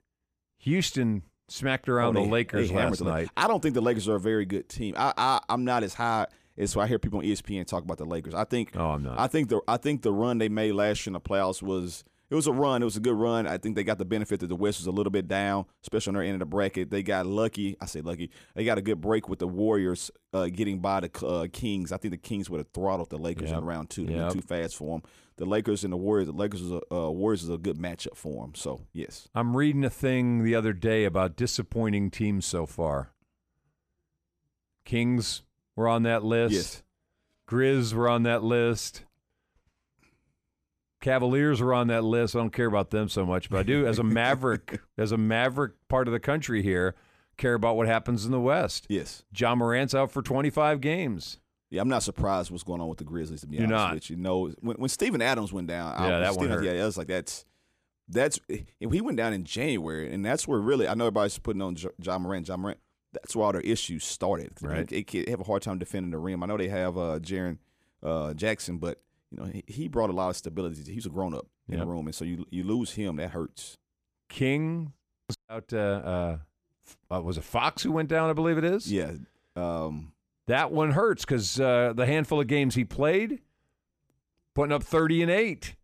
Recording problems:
none

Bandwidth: 14.5 kHz